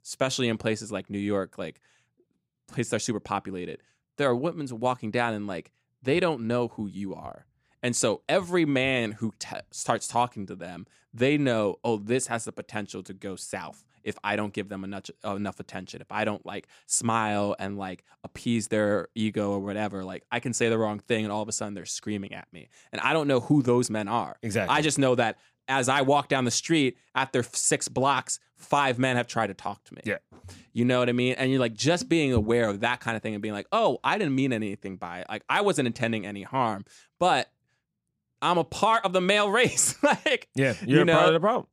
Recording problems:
none

